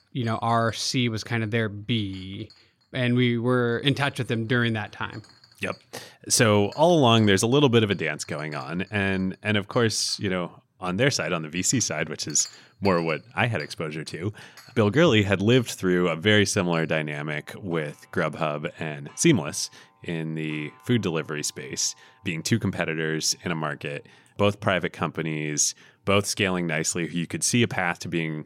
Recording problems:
household noises; faint; throughout; 25 dB below the speech

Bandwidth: 16 kHz